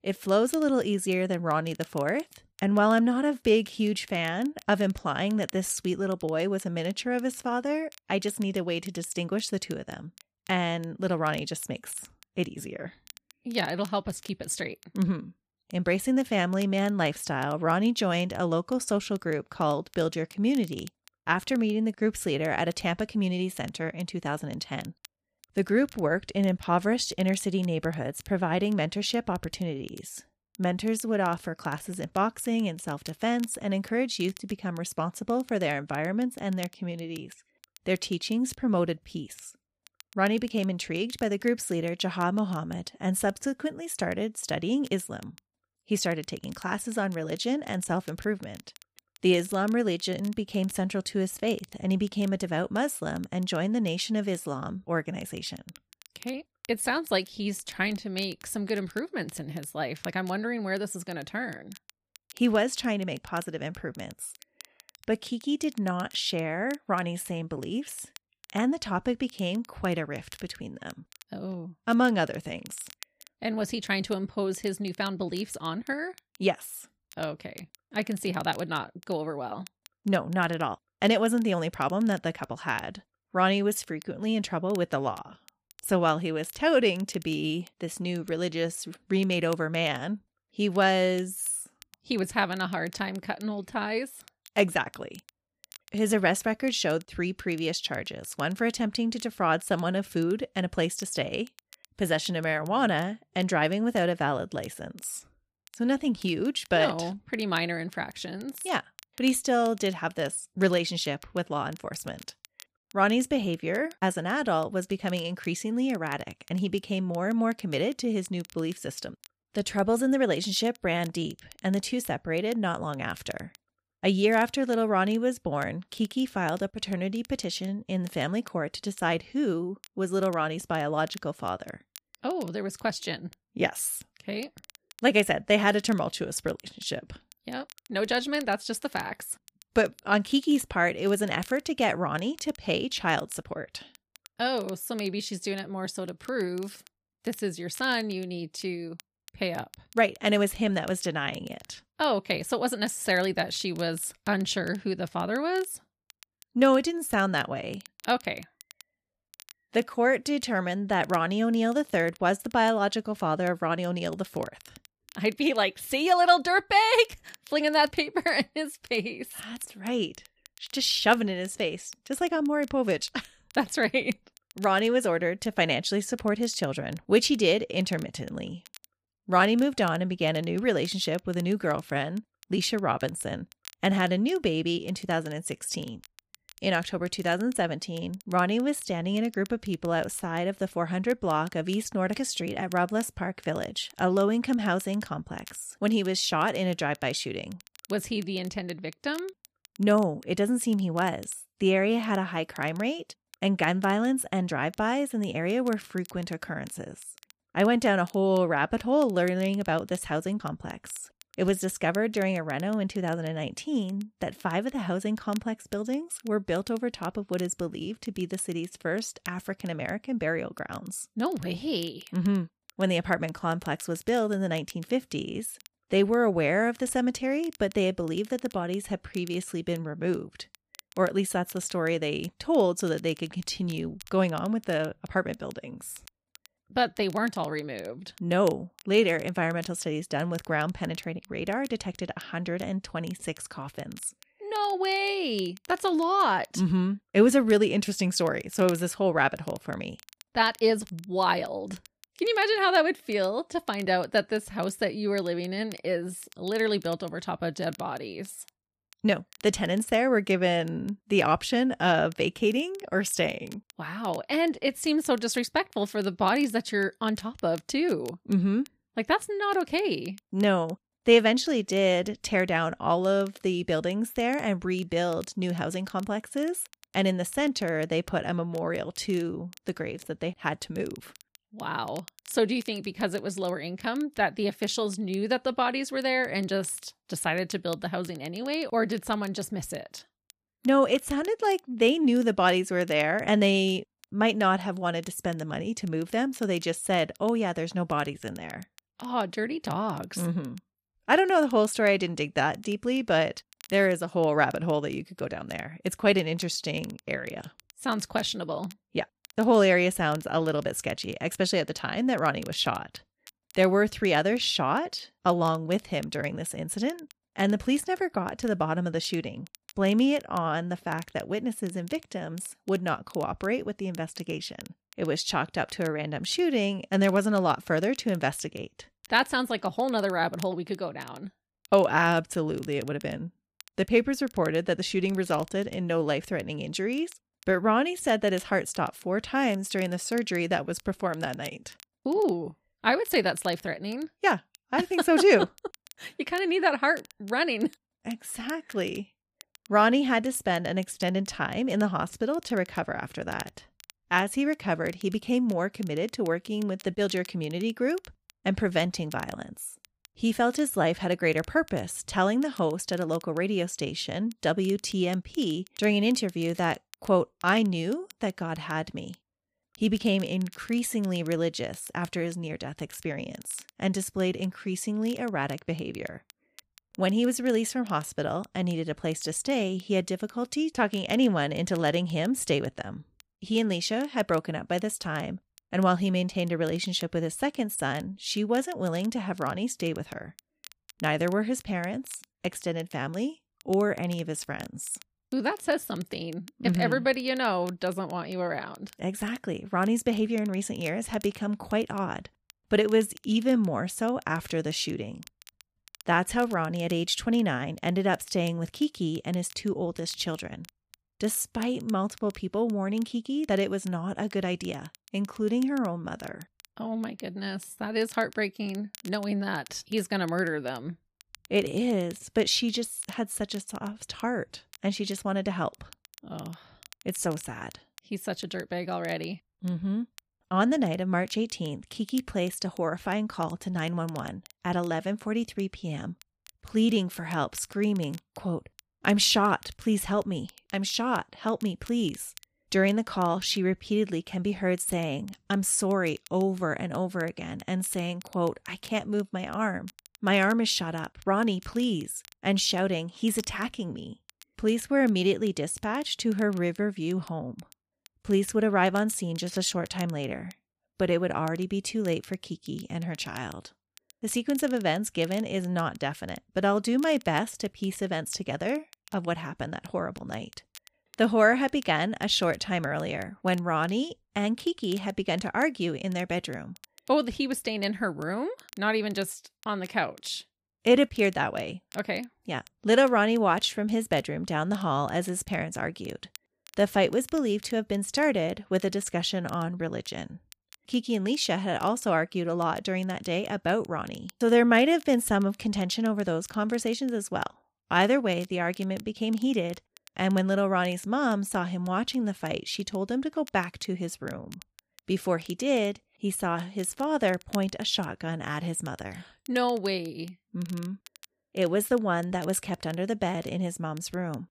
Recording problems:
crackle, like an old record; faint; 25 dB below the speech

